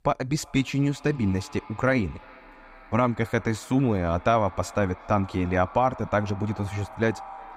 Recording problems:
echo of what is said; faint; throughout; 360 ms later, 20 dB below the speech

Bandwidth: 15.5 kHz